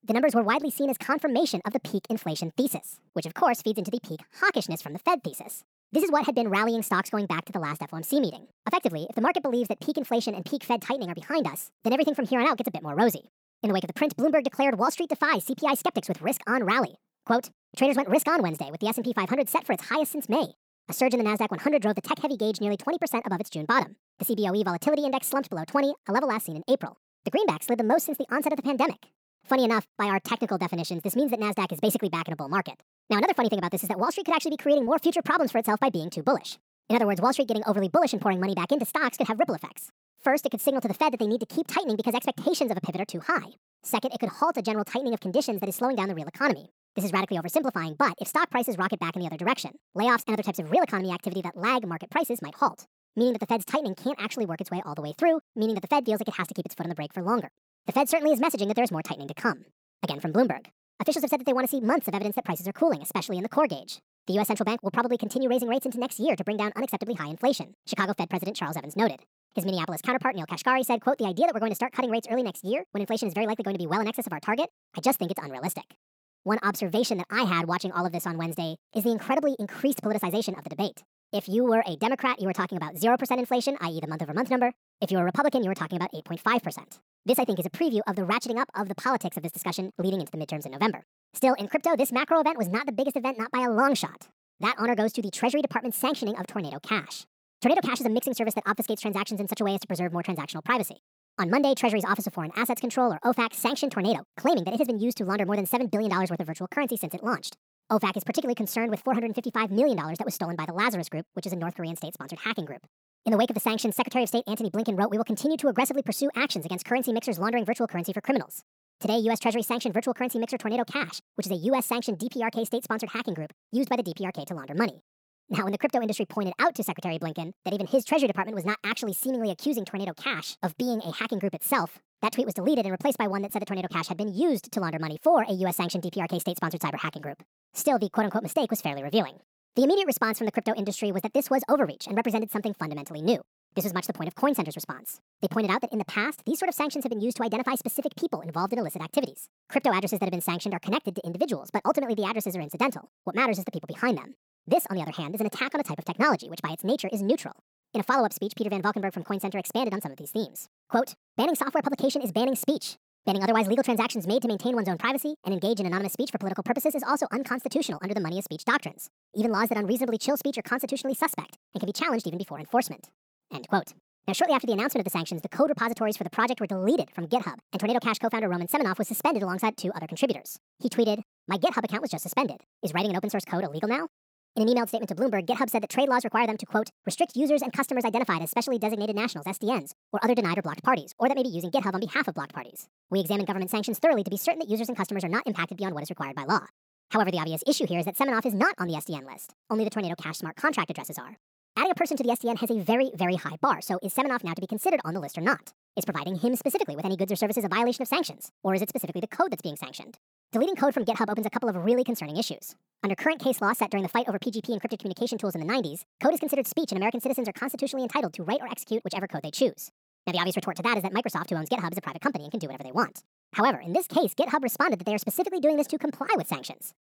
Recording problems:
wrong speed and pitch; too fast and too high; 1.5 times normal speed

